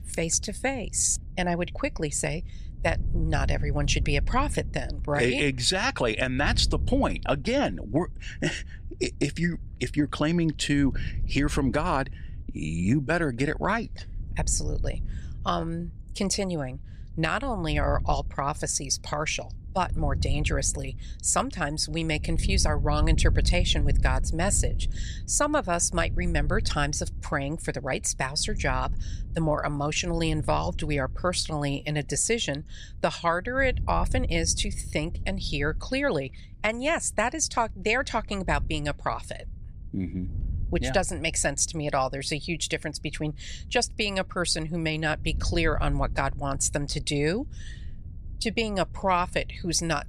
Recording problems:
wind noise on the microphone; occasional gusts; 25 dB below the speech

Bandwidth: 14.5 kHz